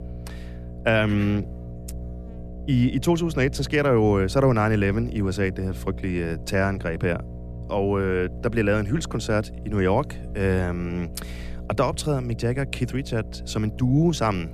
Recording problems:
electrical hum; noticeable; throughout; 60 Hz, 20 dB below the speech

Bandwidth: 14.5 kHz